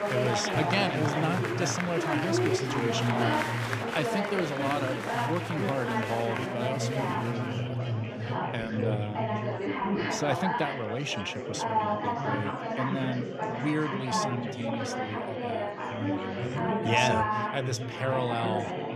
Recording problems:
chatter from many people; very loud; throughout; 2 dB above the speech

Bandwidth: 15 kHz